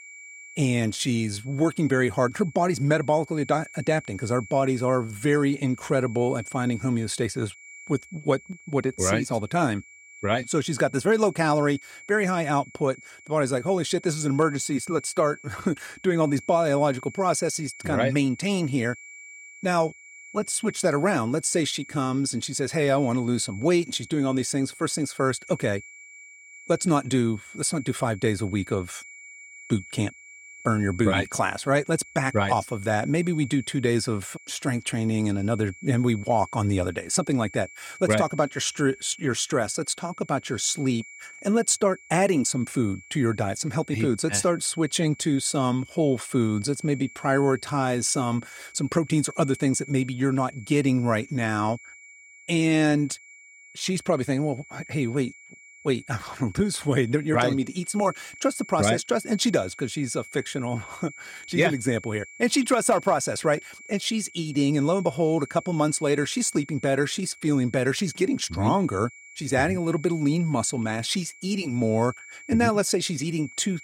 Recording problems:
high-pitched whine; noticeable; throughout; 2.5 kHz, 20 dB below the speech

